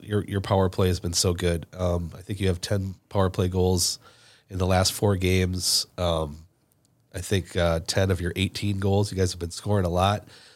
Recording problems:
none

